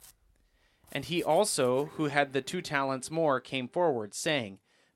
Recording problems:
household noises; faint; throughout; 25 dB below the speech

